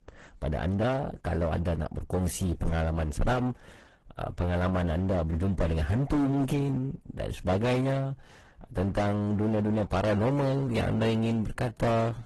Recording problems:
distortion; heavy; 15% of the sound clipped
garbled, watery; slightly; nothing above 12 kHz

